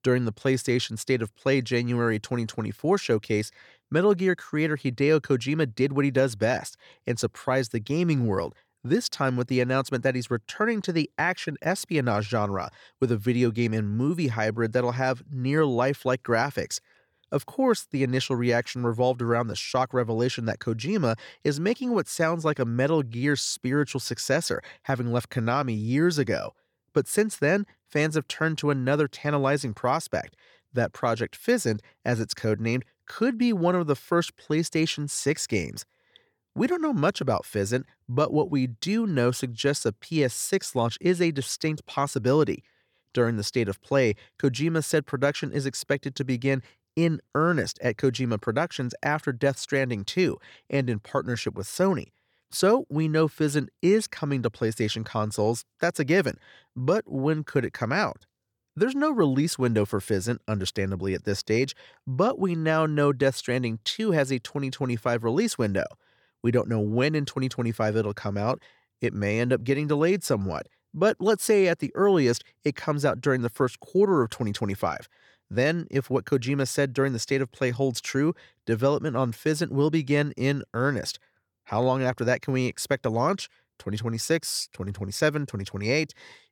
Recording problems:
none

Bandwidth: 18.5 kHz